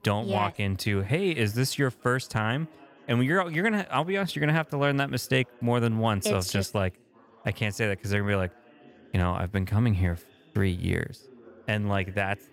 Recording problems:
chatter from many people; faint; throughout; 25 dB below the speech

